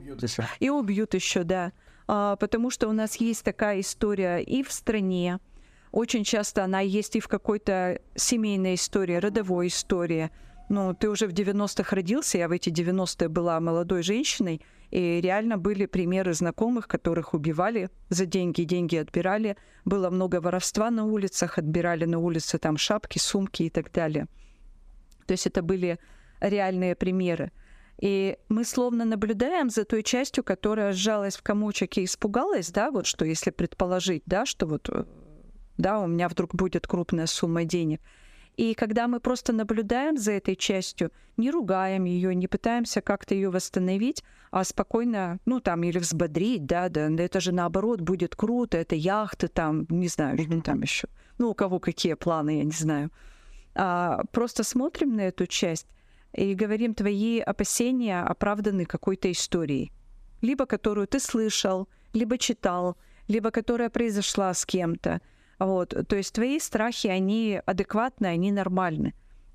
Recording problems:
squashed, flat; somewhat

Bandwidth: 15 kHz